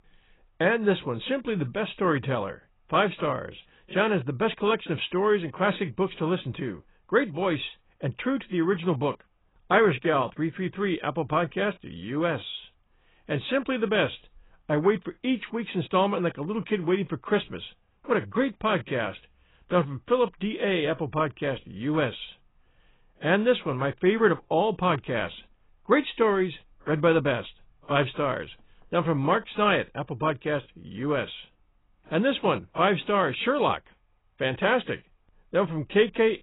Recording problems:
garbled, watery; badly; nothing above 4 kHz

